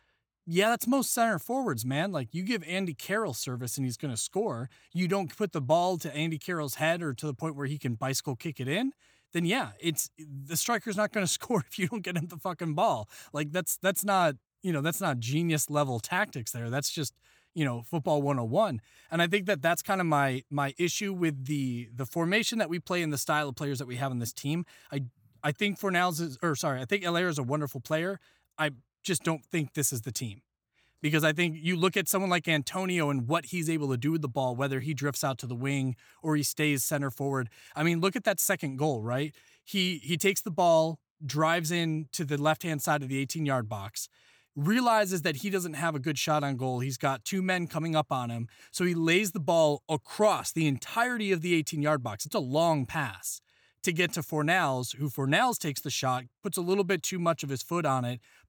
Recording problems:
none

